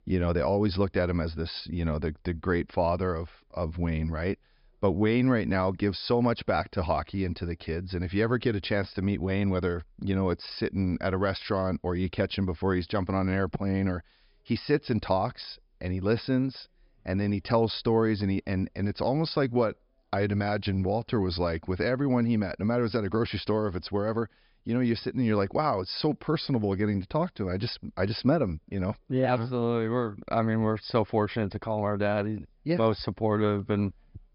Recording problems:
high frequencies cut off; noticeable; nothing above 5.5 kHz

